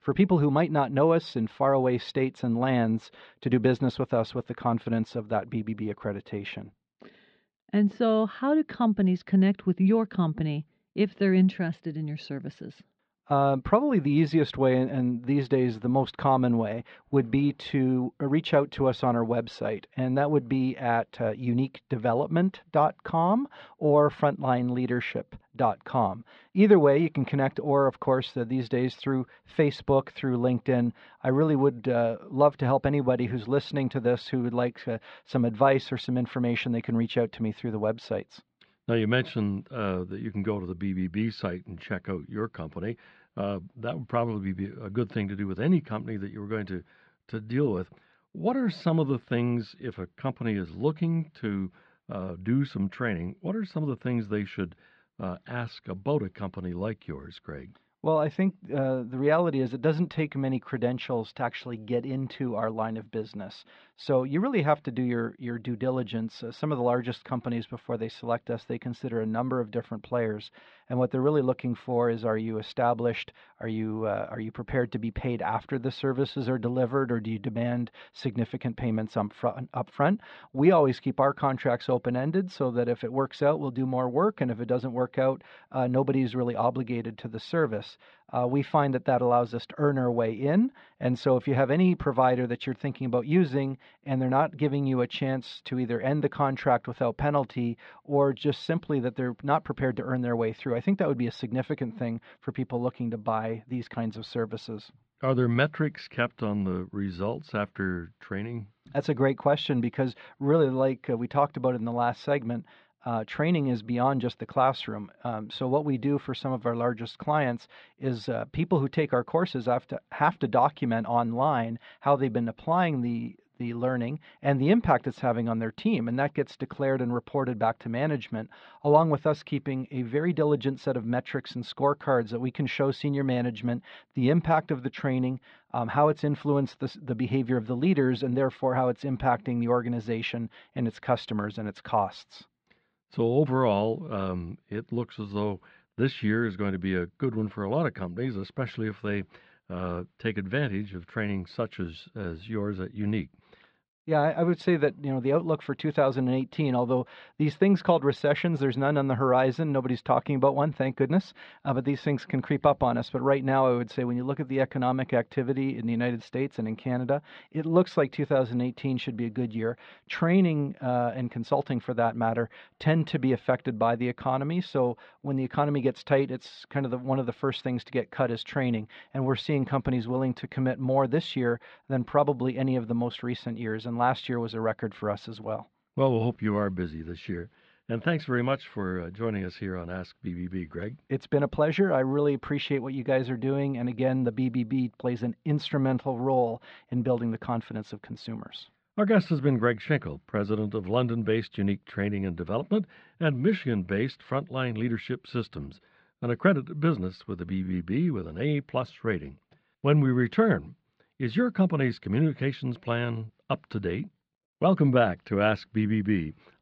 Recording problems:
muffled; slightly; fading above 4 kHz

